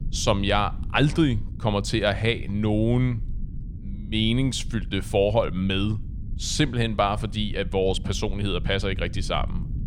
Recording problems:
low rumble; faint; throughout; 20 dB below the speech

